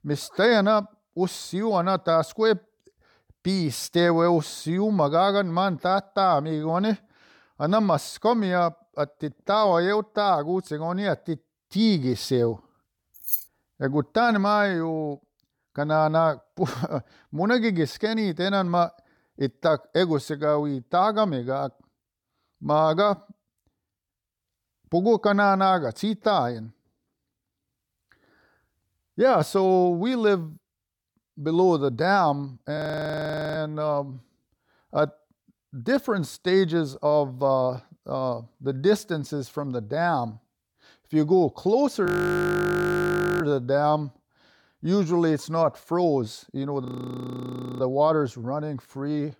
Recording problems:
jangling keys; noticeable; at 13 s; peak 2 dB below the speech
audio freezing; at 33 s for 1 s, at 42 s for 1.5 s and at 47 s for 1 s

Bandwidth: 18.5 kHz